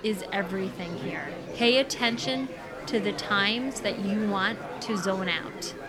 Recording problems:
murmuring crowd; loud; throughout; 10 dB below the speech

